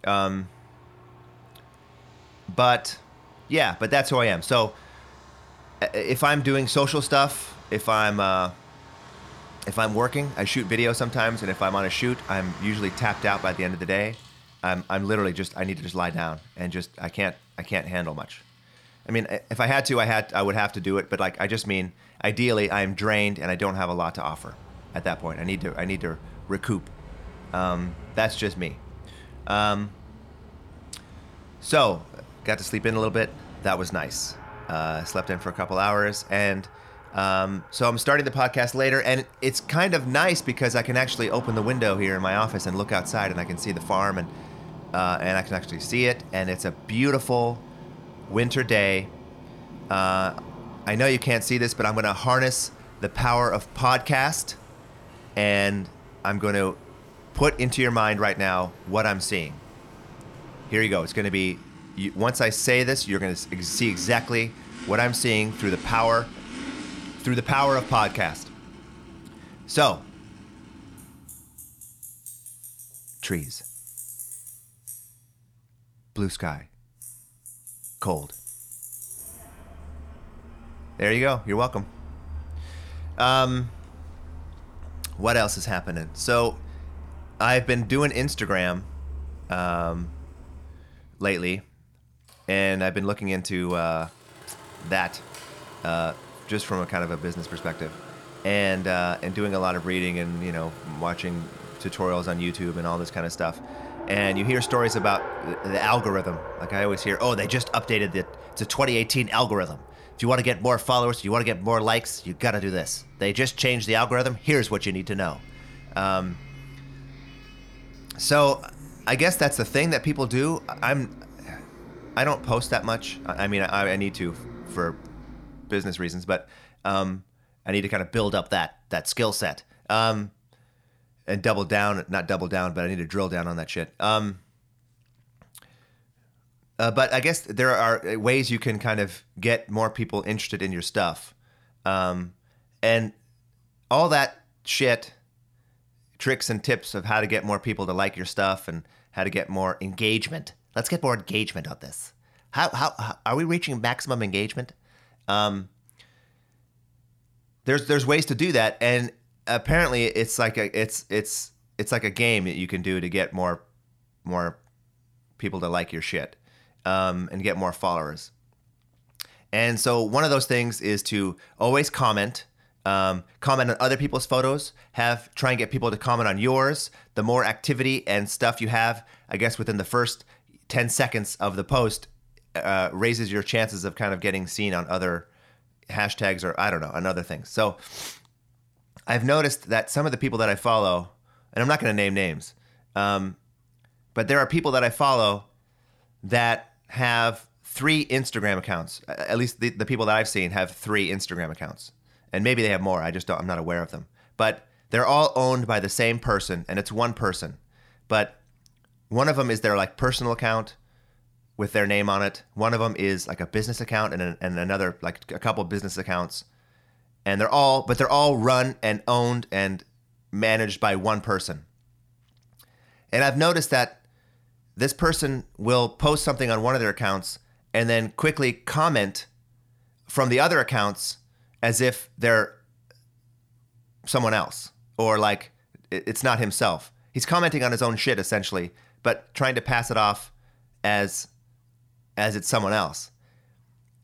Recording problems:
traffic noise; noticeable; until 2:05; 20 dB below the speech

